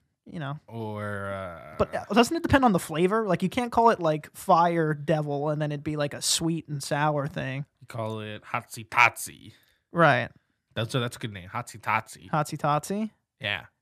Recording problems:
none

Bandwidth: 14.5 kHz